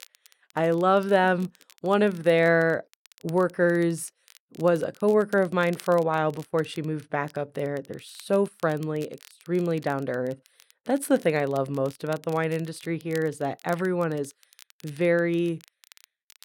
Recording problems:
crackle, like an old record; faint; 25 dB below the speech

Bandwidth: 16.5 kHz